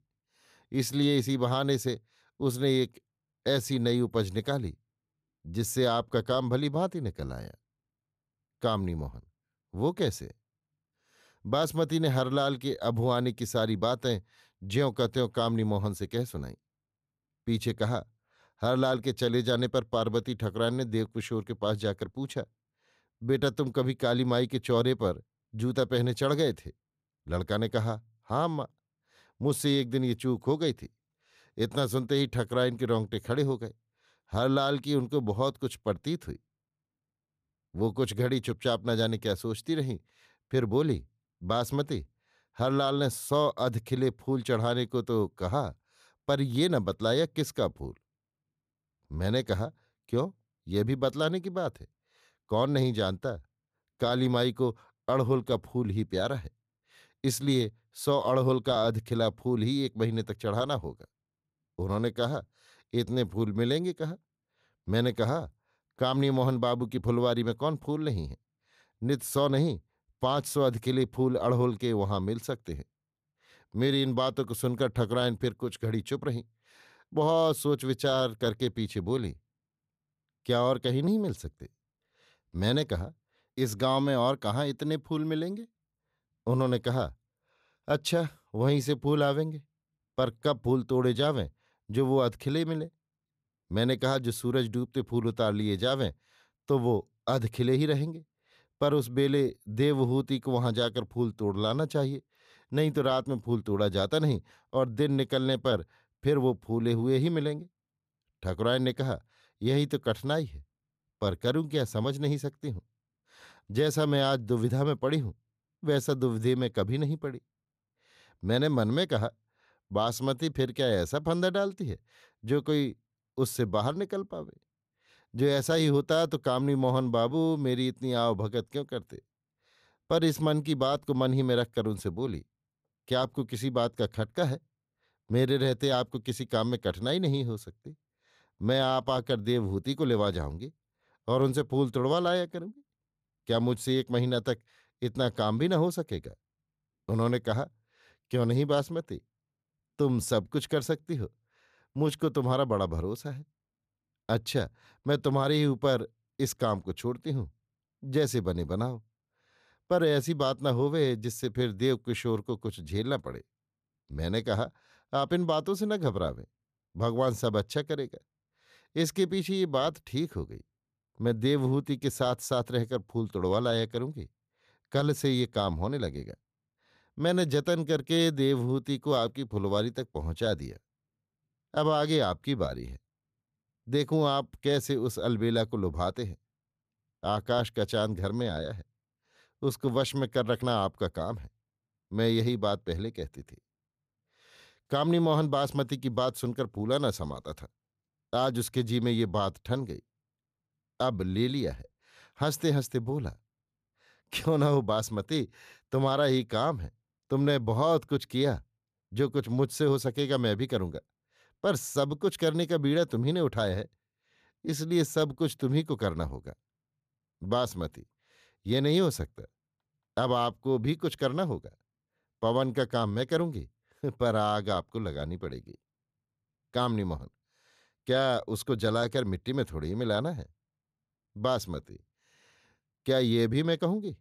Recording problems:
none

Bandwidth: 14.5 kHz